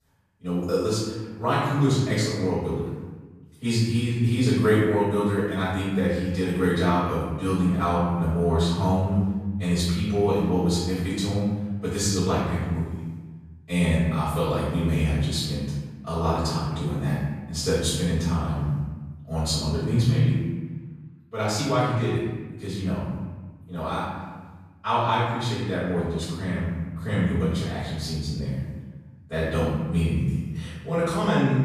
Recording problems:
room echo; strong; dies away in 1.3 s
off-mic speech; far

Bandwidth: 14.5 kHz